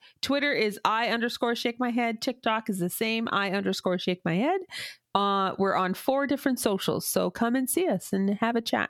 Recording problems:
squashed, flat; heavily

